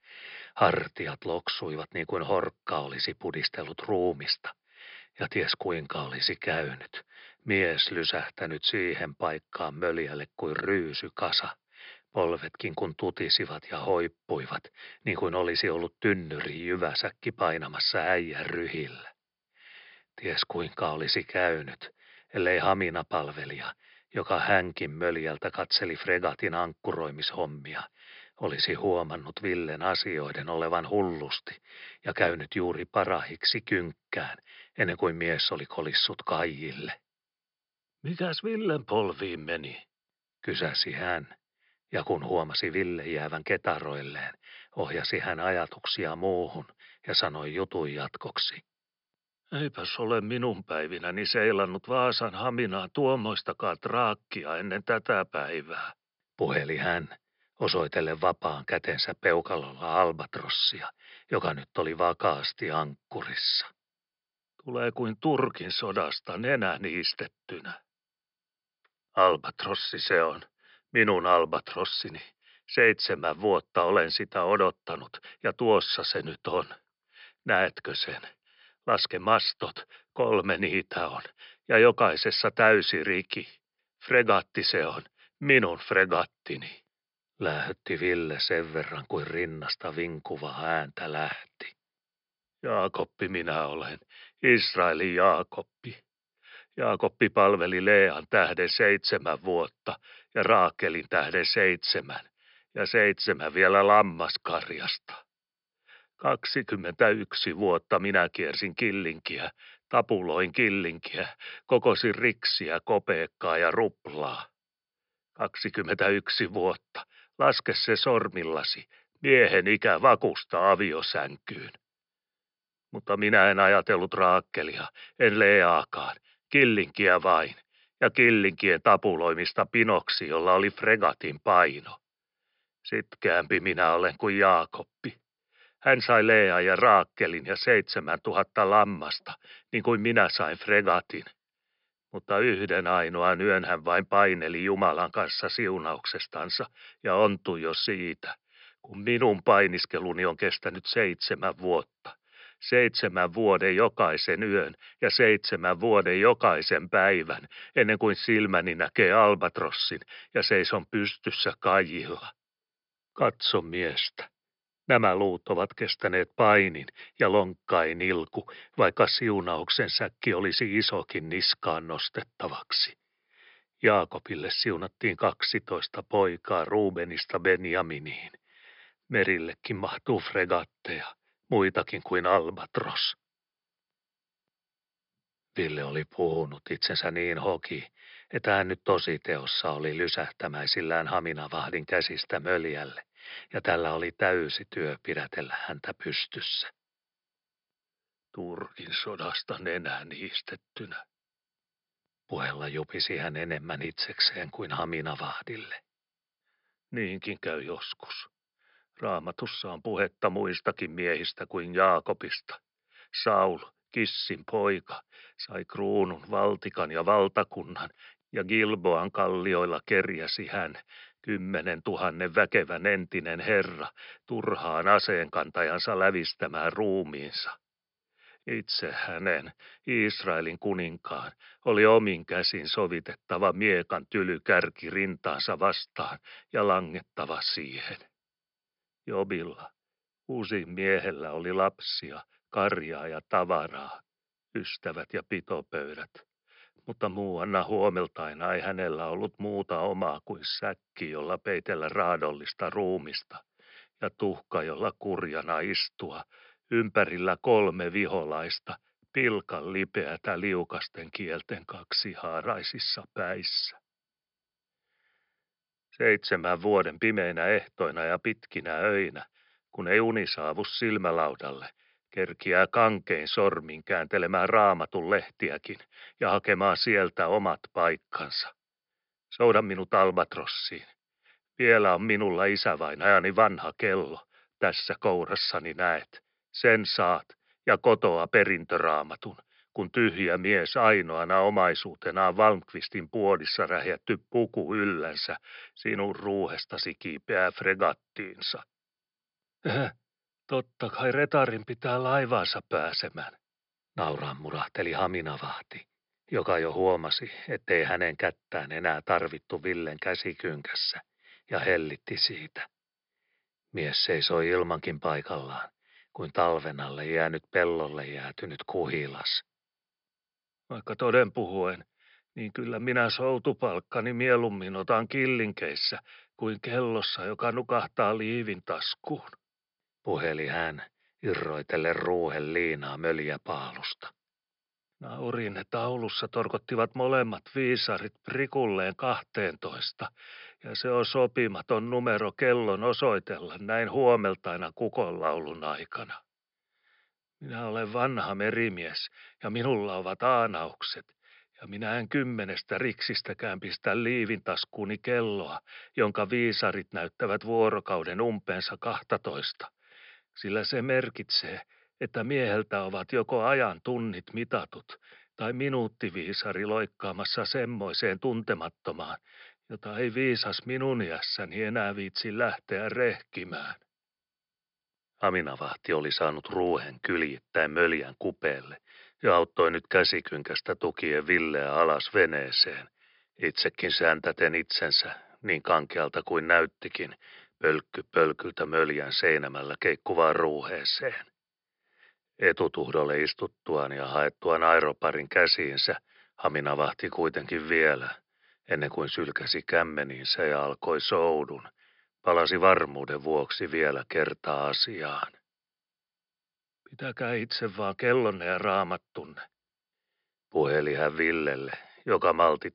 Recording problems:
high frequencies cut off; noticeable; nothing above 5.5 kHz

